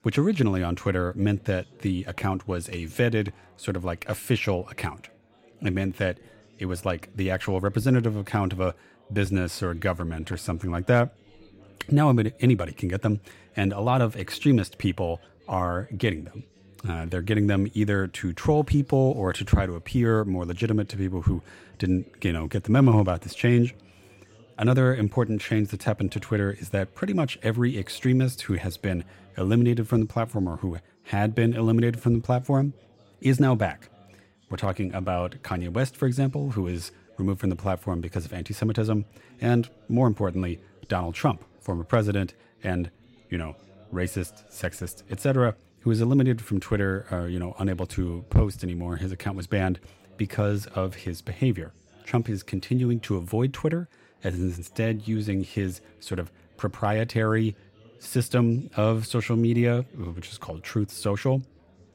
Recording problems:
chatter from many people; faint; throughout; 30 dB below the speech

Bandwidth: 16 kHz